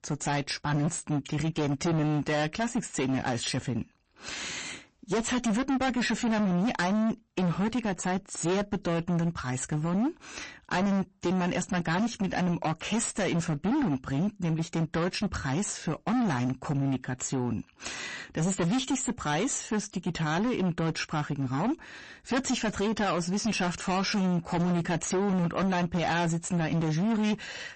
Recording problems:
distortion; heavy; 24% of the sound clipped
garbled, watery; slightly; nothing above 8 kHz

